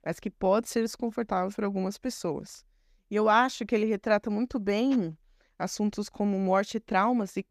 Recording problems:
none

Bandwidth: 14.5 kHz